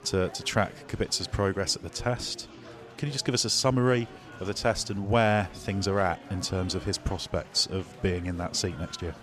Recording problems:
chatter from many people; noticeable; throughout; 20 dB below the speech

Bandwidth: 14 kHz